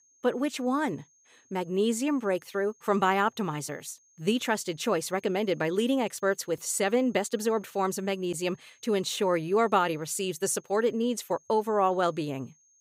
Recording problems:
high-pitched whine; faint; throughout; 6.5 kHz, 35 dB below the speech

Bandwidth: 15.5 kHz